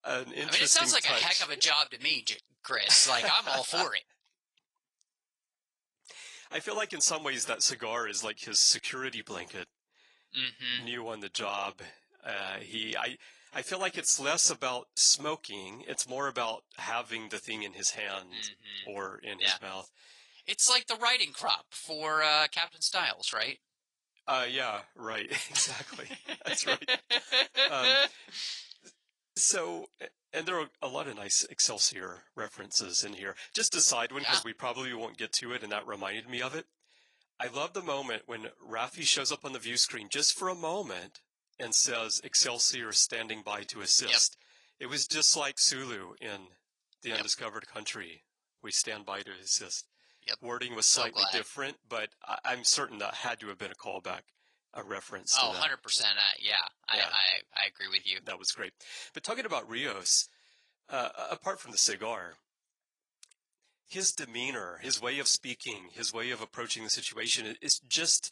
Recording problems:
thin; very; fading below 650 Hz
garbled, watery; slightly; nothing above 10 kHz

